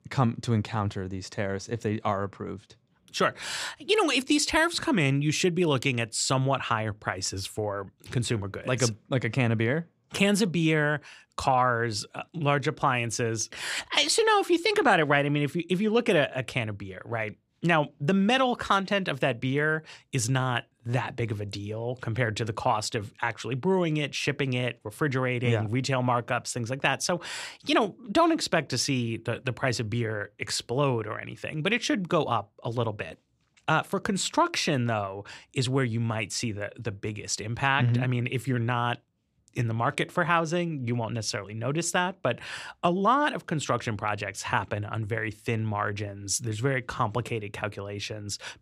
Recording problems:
none

